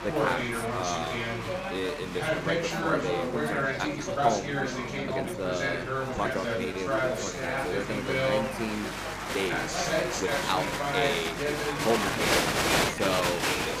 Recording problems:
chatter from many people; very loud; throughout; 5 dB above the speech
electrical hum; noticeable; throughout; 50 Hz, 20 dB below the speech
uneven, jittery; strongly; from 0.5 to 13 s

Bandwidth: 15 kHz